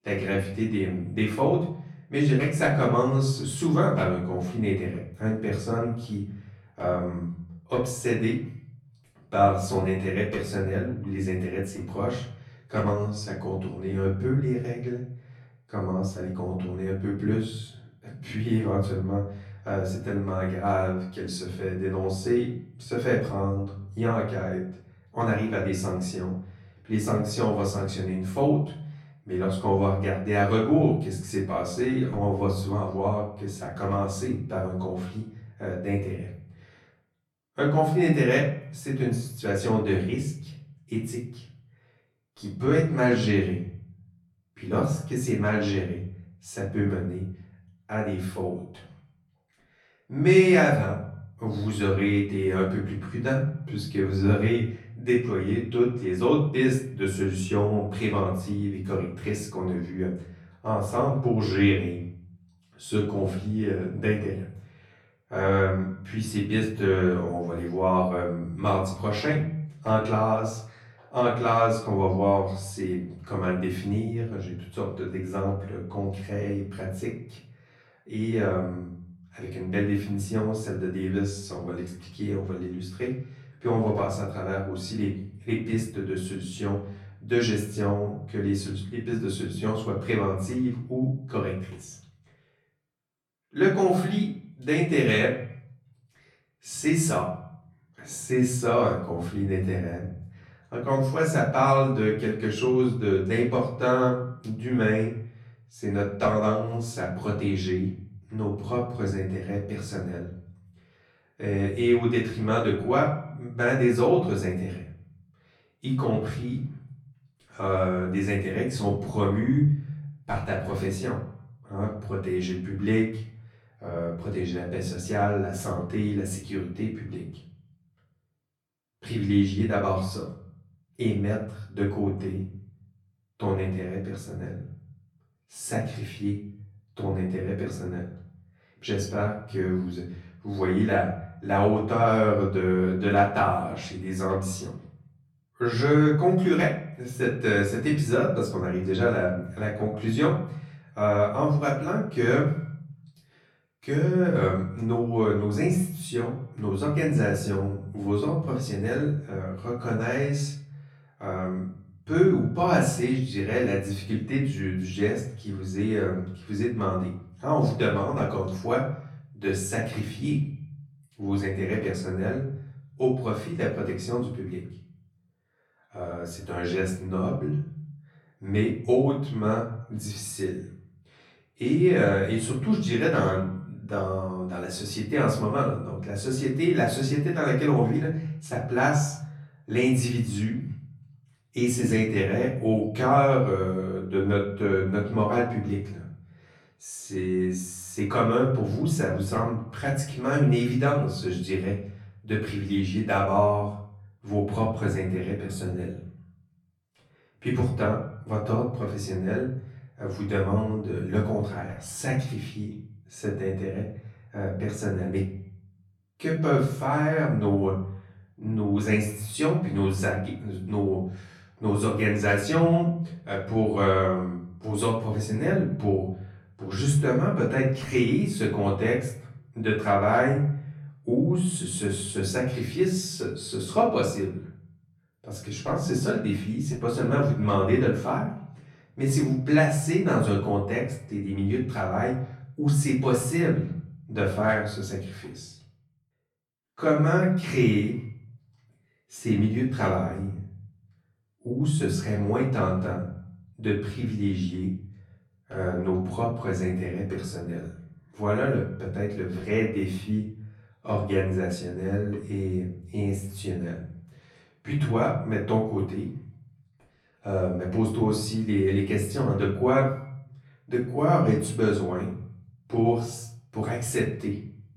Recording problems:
off-mic speech; far
room echo; noticeable; dies away in 0.6 s
echo of what is said; faint; throughout; 90 ms later, 25 dB below the speech

